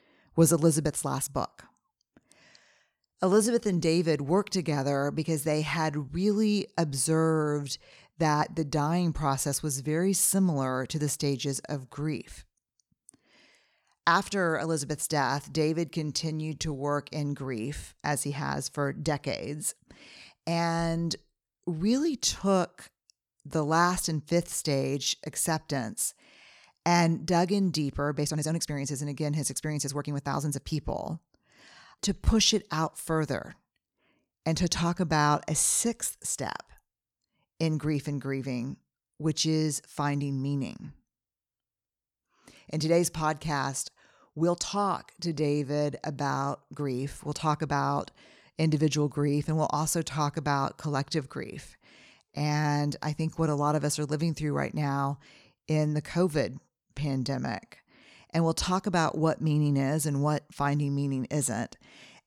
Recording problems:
uneven, jittery; strongly; from 1 to 58 s

